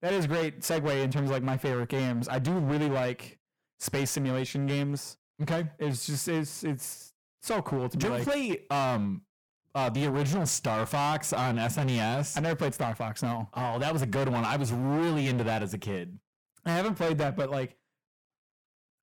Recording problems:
distortion; heavy; 21% of the sound clipped

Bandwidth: 17.5 kHz